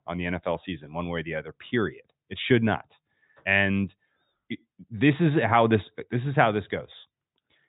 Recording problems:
high frequencies cut off; severe; nothing above 4 kHz

